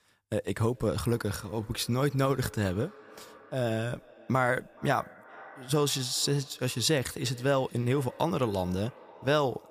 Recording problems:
echo of what is said; faint; throughout; 420 ms later, 20 dB below the speech

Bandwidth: 15 kHz